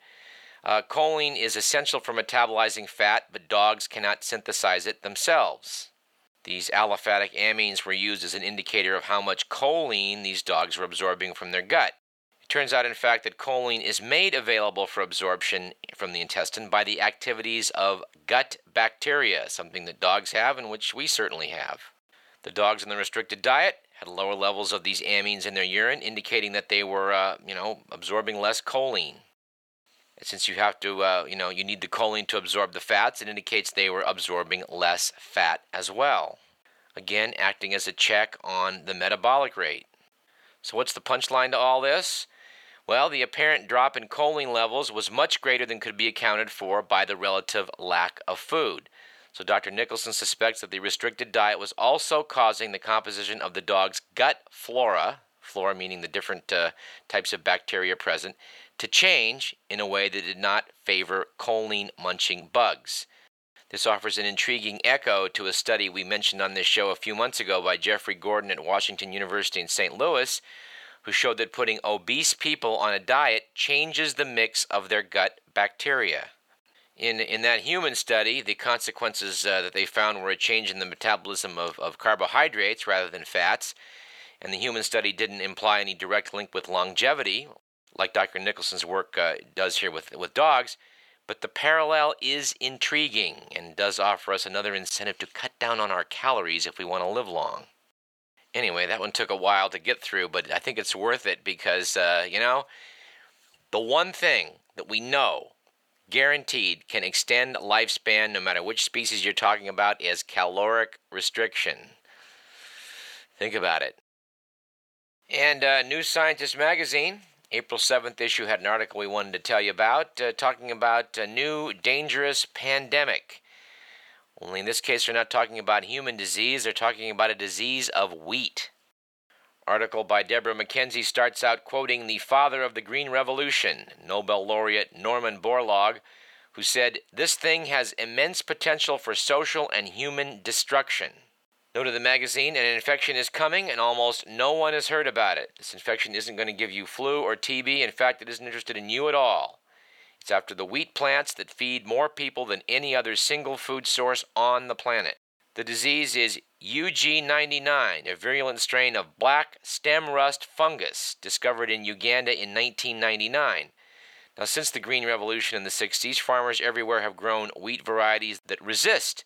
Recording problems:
thin; very; fading below 700 Hz

